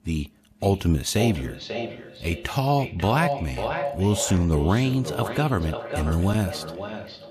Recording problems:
echo of what is said; strong; throughout; 540 ms later, 8 dB below the speech

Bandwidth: 14.5 kHz